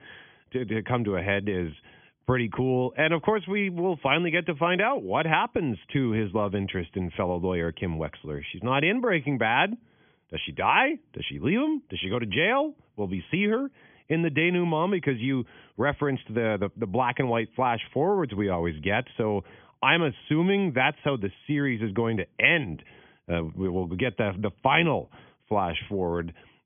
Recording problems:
high frequencies cut off; severe; nothing above 3.5 kHz

